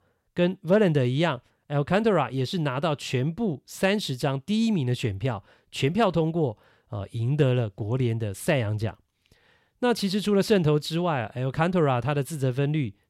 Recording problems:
none

